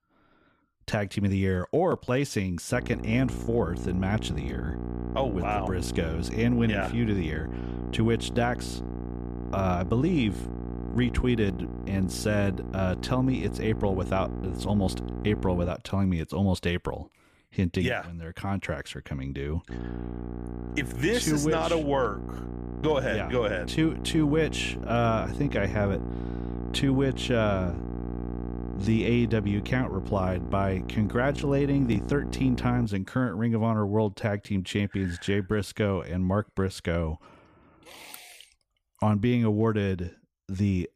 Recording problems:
electrical hum; noticeable; from 2.5 to 16 s and from 20 to 33 s; 60 Hz, 10 dB below the speech

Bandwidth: 15 kHz